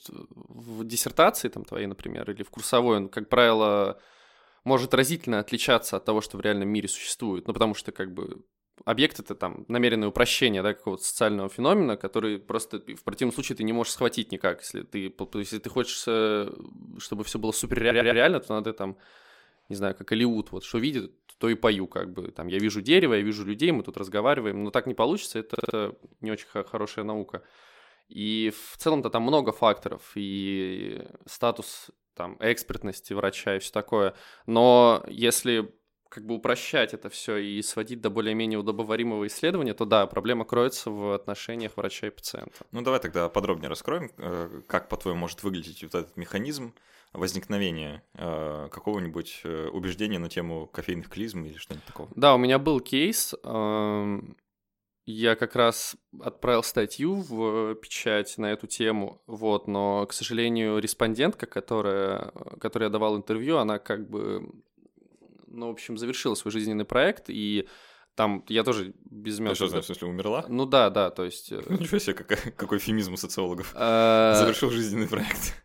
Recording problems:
audio stuttering; at 18 s and at 26 s

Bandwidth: 16.5 kHz